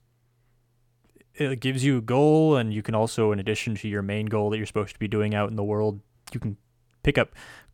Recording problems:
none

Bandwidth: 17 kHz